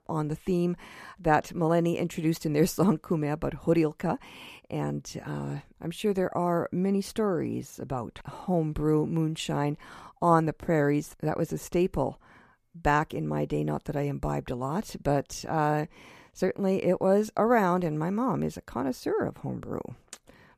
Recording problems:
none

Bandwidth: 14.5 kHz